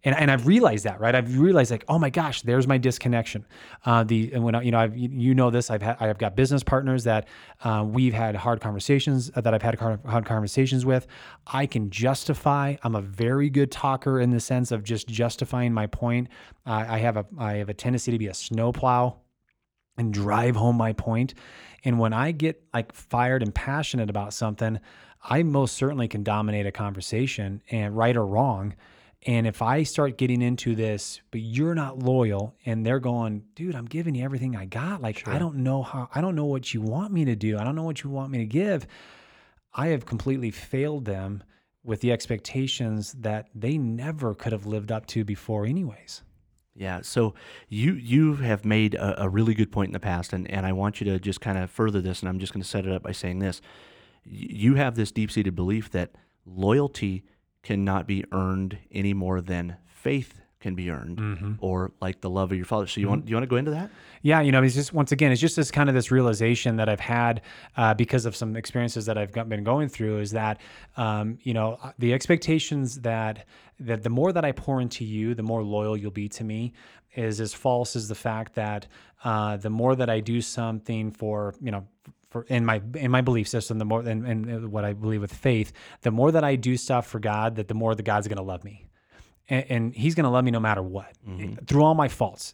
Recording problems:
none

